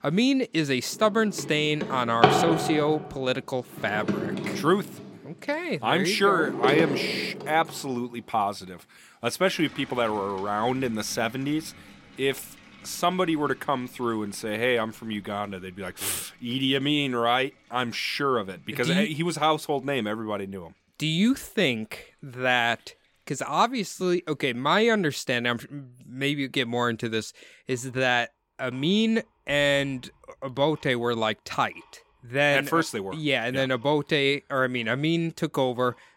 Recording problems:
household noises; loud; throughout; 5 dB below the speech

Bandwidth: 16.5 kHz